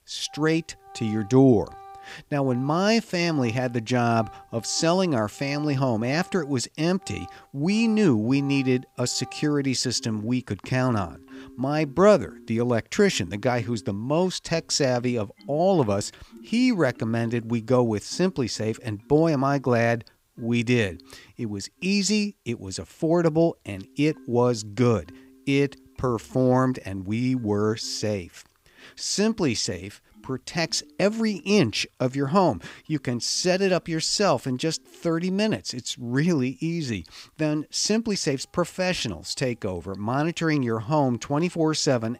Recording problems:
background music; faint; throughout; 25 dB below the speech

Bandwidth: 15.5 kHz